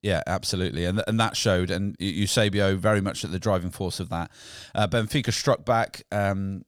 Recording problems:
none

